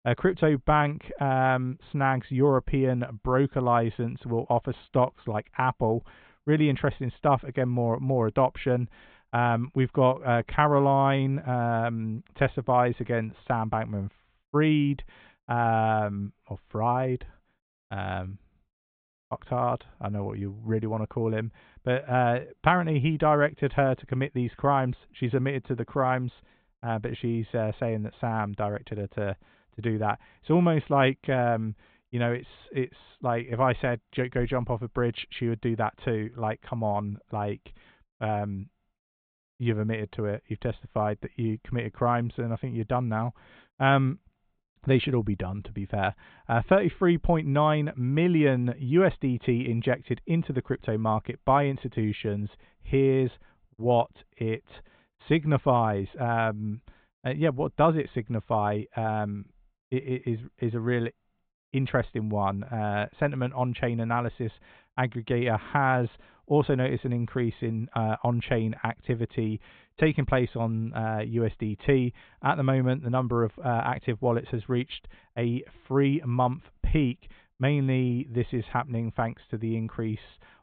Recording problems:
high frequencies cut off; severe; nothing above 4 kHz

